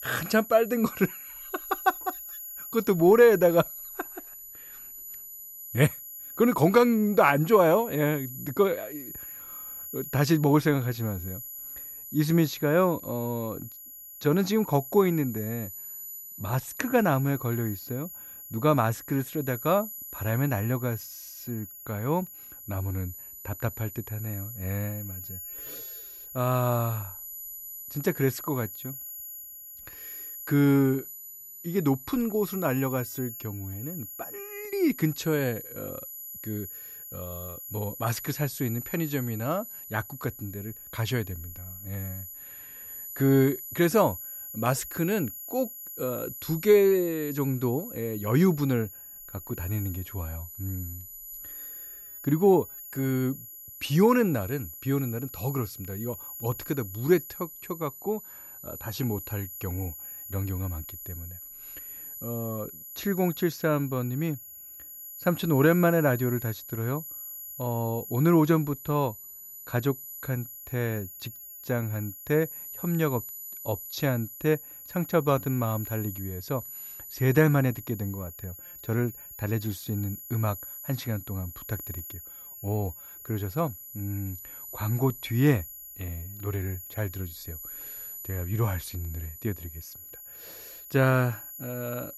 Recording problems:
high-pitched whine; noticeable; throughout; 12 kHz, 10 dB below the speech

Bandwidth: 14.5 kHz